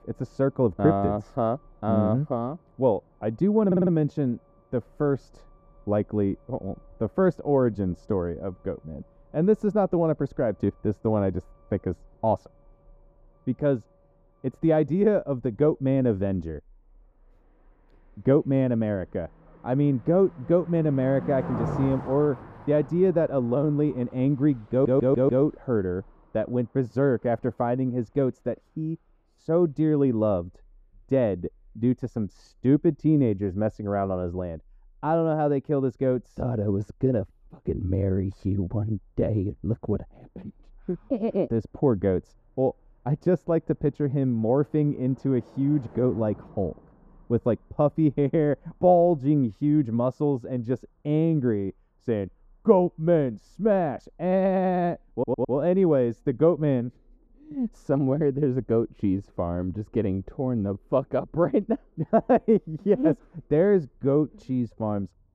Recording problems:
muffled; very; fading above 1.5 kHz
traffic noise; noticeable; throughout; 20 dB below the speech
audio stuttering; at 3.5 s, at 25 s and at 55 s

